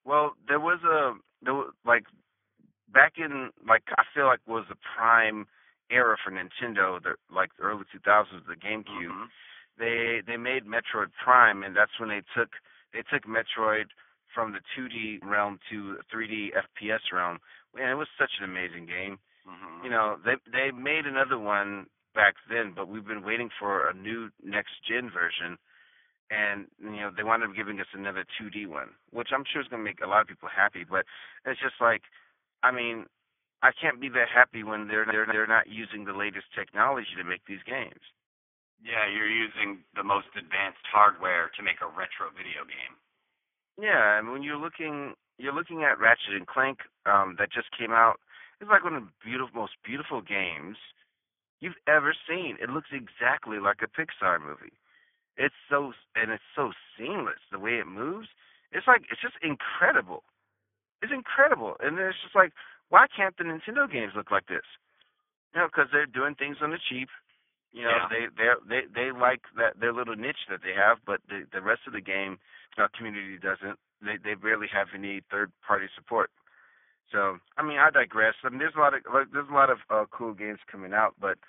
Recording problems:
garbled, watery; badly
thin; very; fading below 850 Hz
high frequencies cut off; severe; nothing above 3.5 kHz
muffled; very slightly; fading above 4 kHz
audio stuttering; at 10 s and at 35 s

